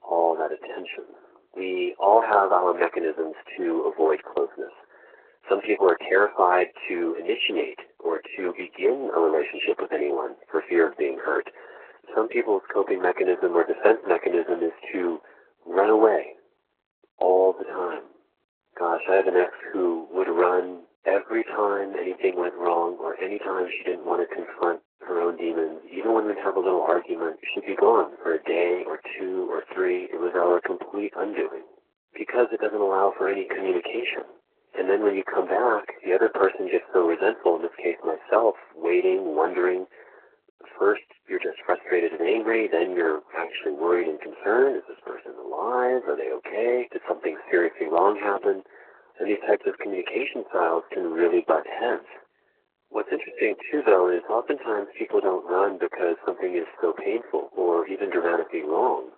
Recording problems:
garbled, watery; badly
phone-call audio

